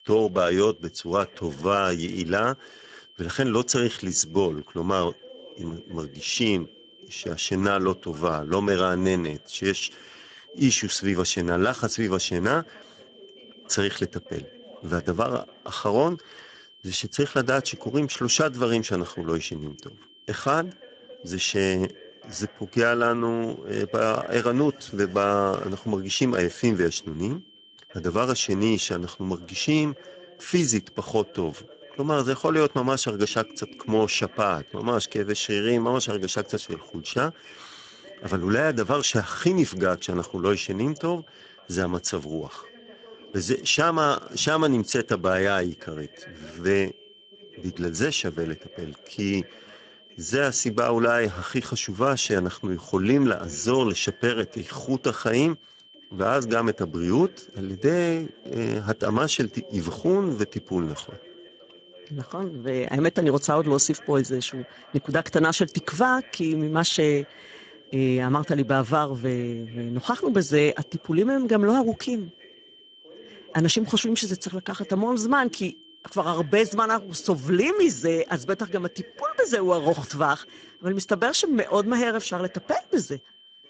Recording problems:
garbled, watery; badly; nothing above 7.5 kHz
high-pitched whine; faint; throughout; 3 kHz, 25 dB below the speech
voice in the background; faint; throughout; 25 dB below the speech

